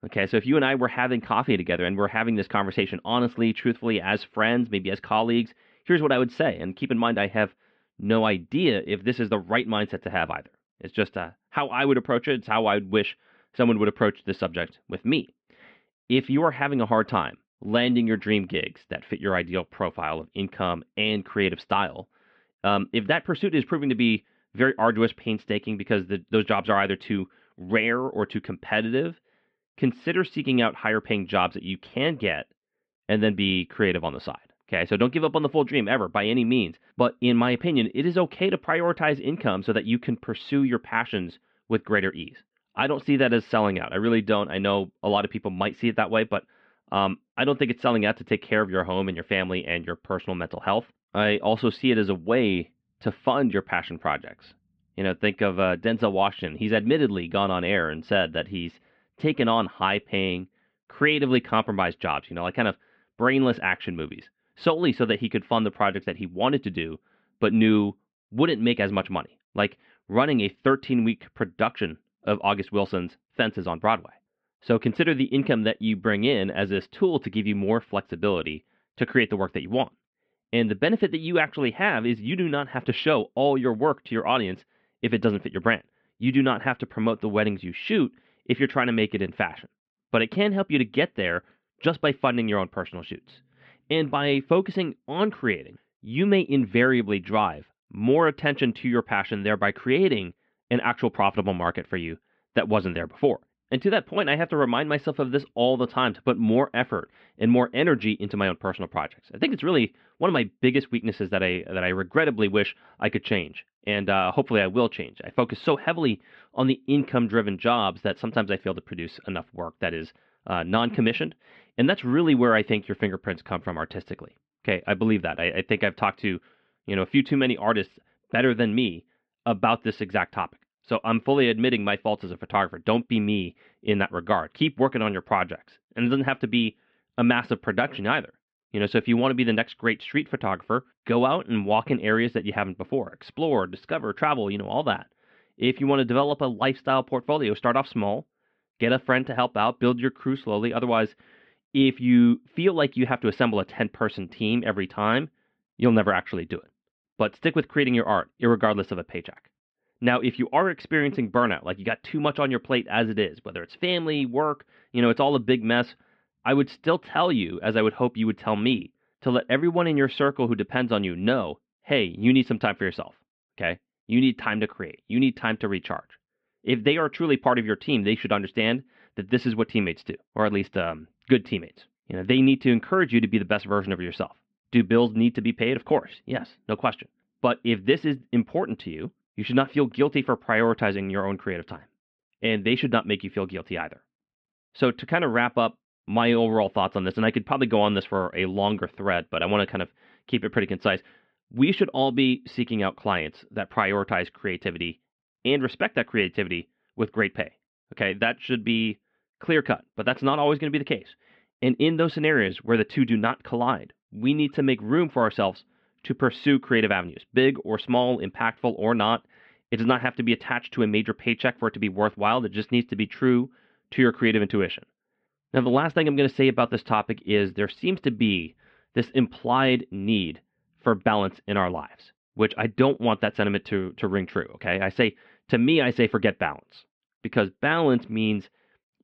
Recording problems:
muffled; very; fading above 3 kHz

